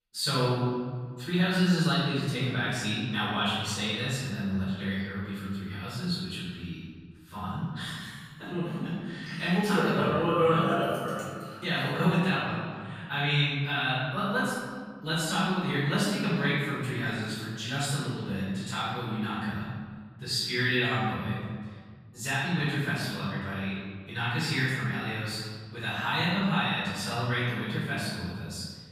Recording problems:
room echo; strong; dies away in 1.7 s
off-mic speech; far

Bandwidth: 15 kHz